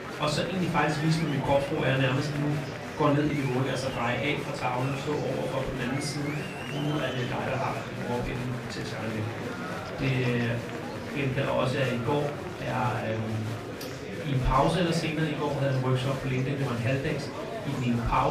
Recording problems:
off-mic speech; far
room echo; slight; dies away in 0.4 s
murmuring crowd; loud; throughout; 7 dB below the speech
electrical hum; faint; throughout; 60 Hz, 20 dB below the speech
abrupt cut into speech; at the end

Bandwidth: 15 kHz